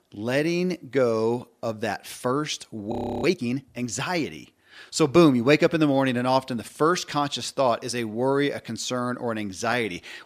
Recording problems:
audio freezing; at 3 s

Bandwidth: 14.5 kHz